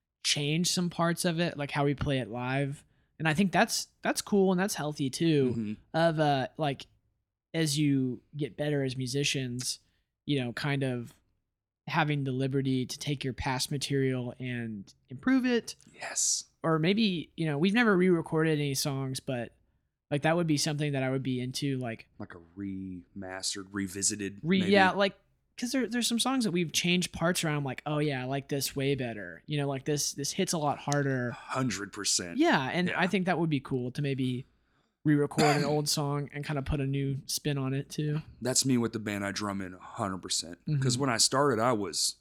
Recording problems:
none

